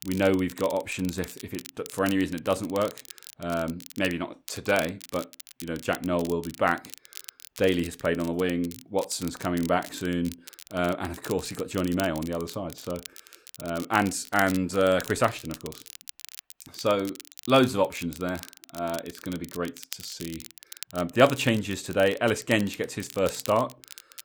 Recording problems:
crackle, like an old record; noticeable; 15 dB below the speech

